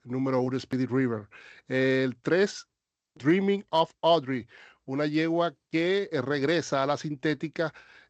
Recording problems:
none

